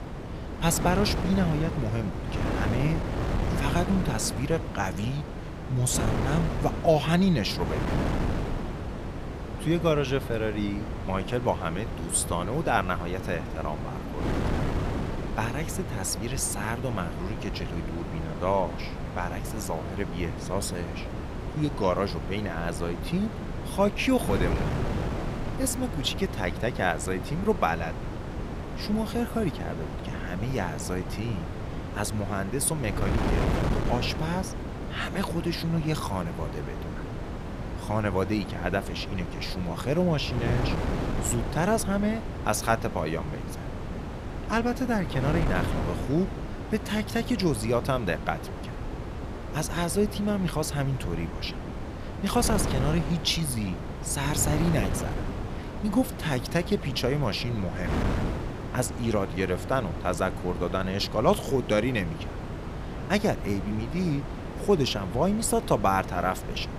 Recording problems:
wind noise on the microphone; heavy; 7 dB below the speech

